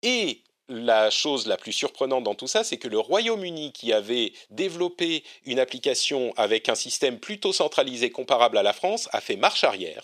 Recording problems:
thin; somewhat; fading below 450 Hz

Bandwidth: 14 kHz